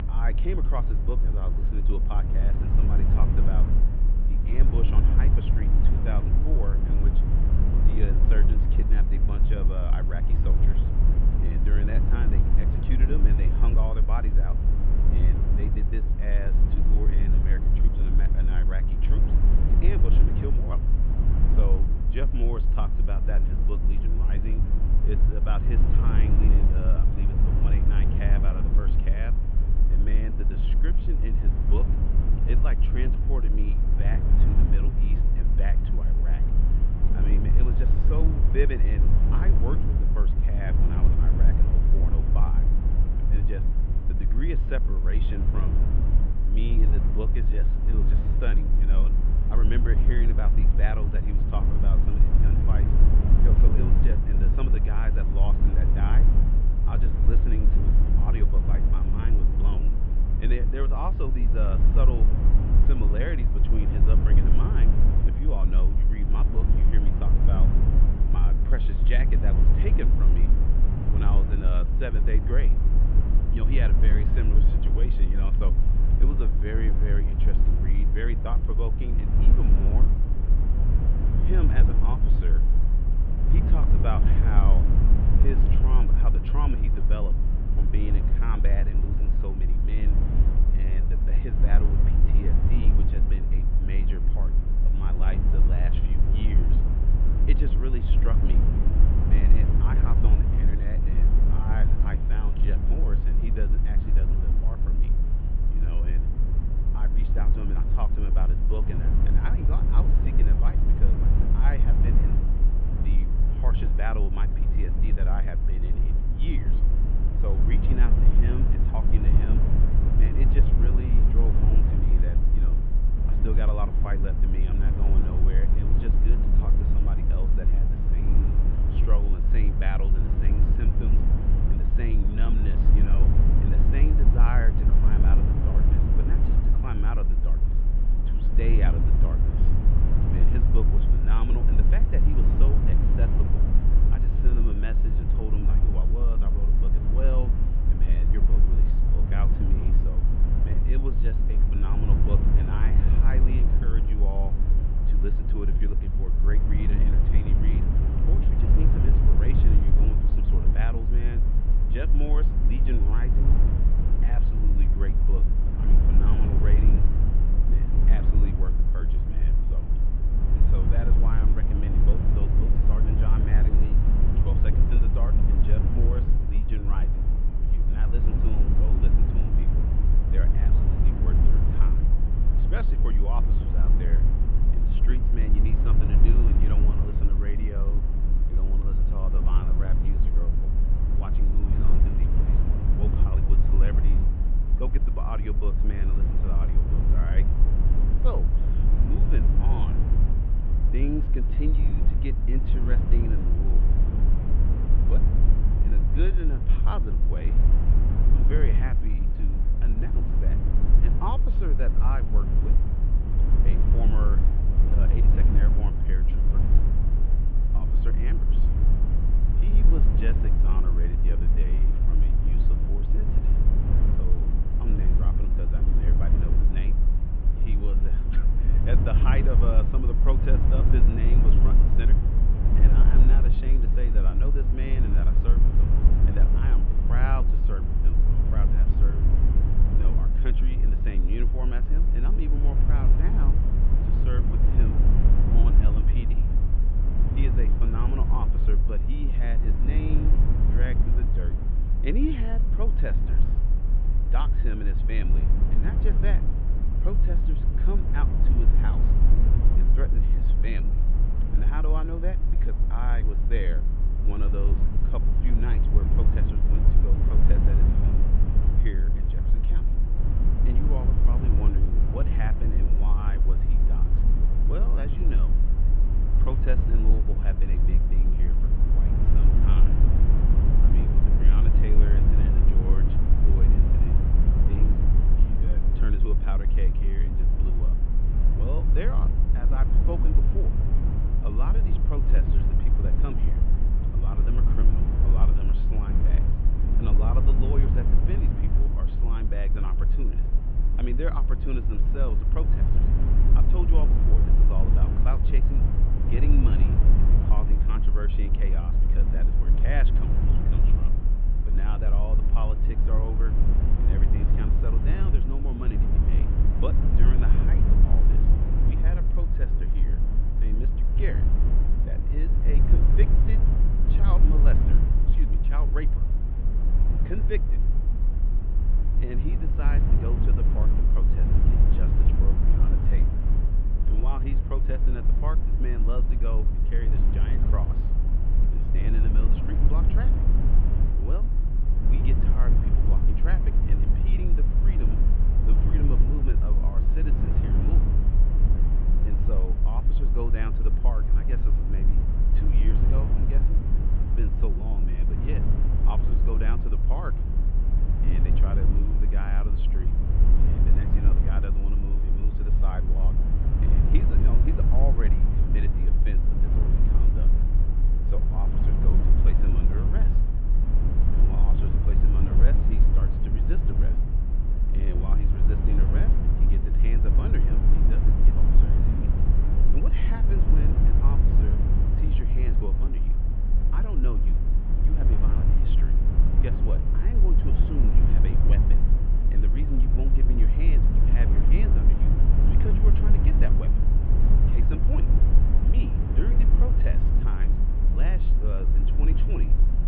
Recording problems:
muffled; very; fading above 3 kHz
low rumble; loud; throughout; 1 dB below the speech

